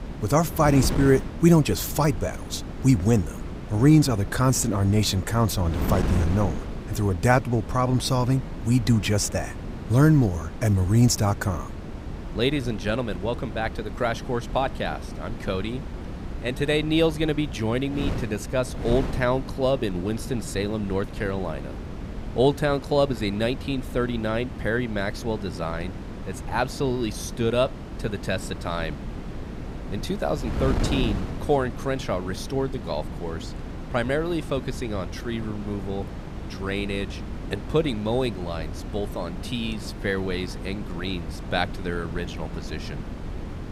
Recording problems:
wind noise on the microphone; occasional gusts; 10 dB below the speech

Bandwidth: 15.5 kHz